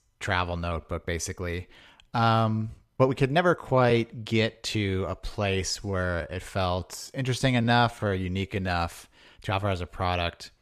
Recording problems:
uneven, jittery; strongly; from 0.5 to 10 s

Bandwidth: 14.5 kHz